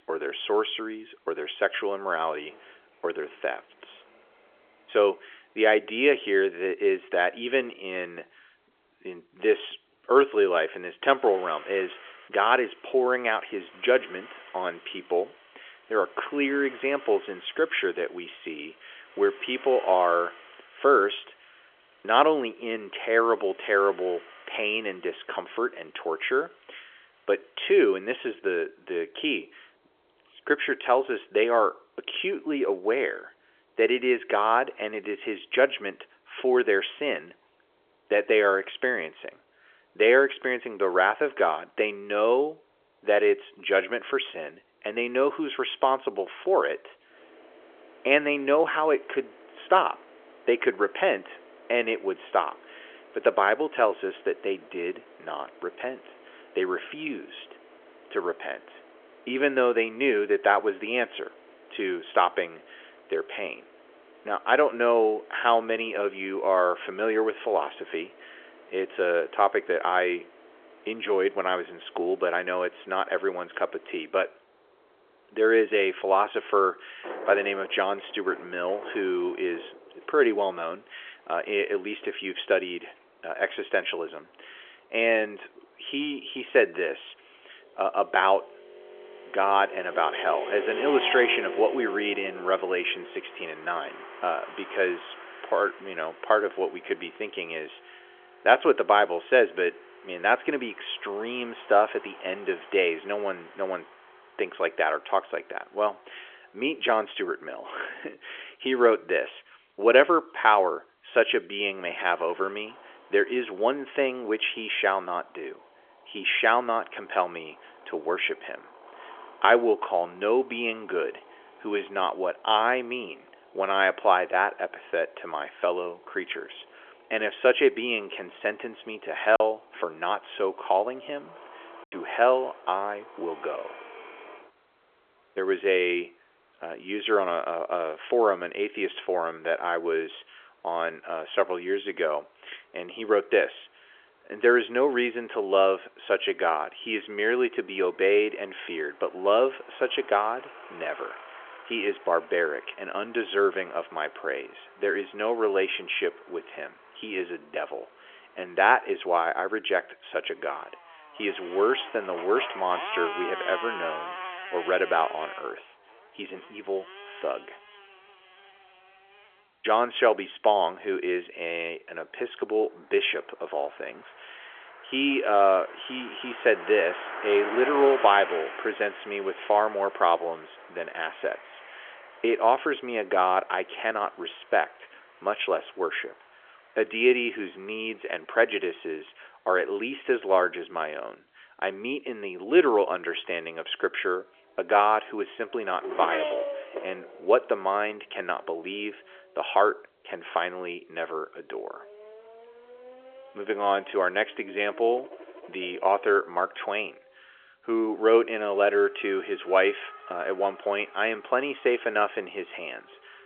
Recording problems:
phone-call audio; nothing above 3.5 kHz
traffic noise; noticeable; throughout; 15 dB below the speech
choppy; occasionally; from 2:09 to 2:12; 2% of the speech affected

